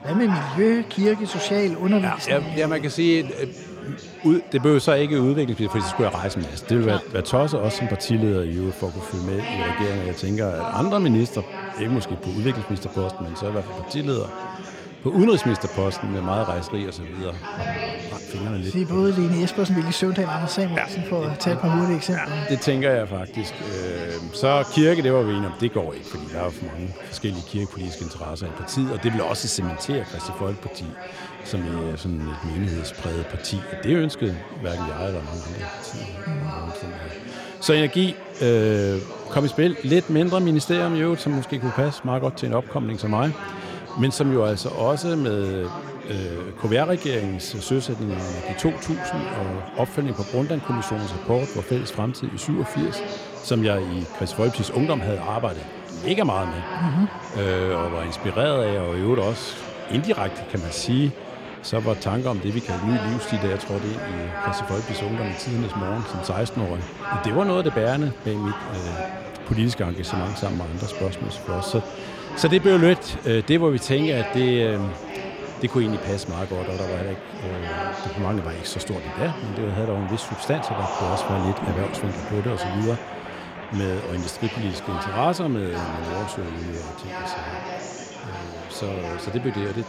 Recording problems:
chatter from many people; loud; throughout; 9 dB below the speech

